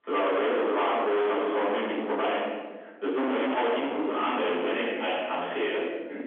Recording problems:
distortion; heavy; 35% of the sound clipped
room echo; strong; dies away in 1.1 s
off-mic speech; far
phone-call audio; nothing above 3.5 kHz

